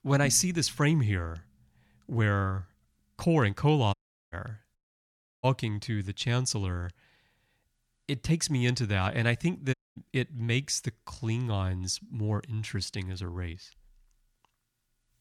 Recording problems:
audio cutting out; at 4 s, at 5 s for 0.5 s and at 9.5 s

